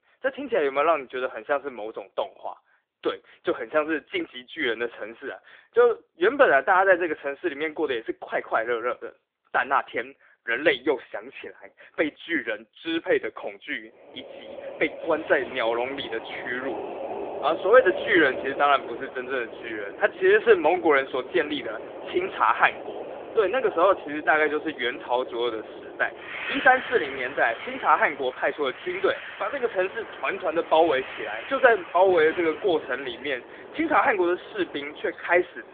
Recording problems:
phone-call audio; nothing above 3.5 kHz
wind in the background; noticeable; from 14 s on; 10 dB below the speech

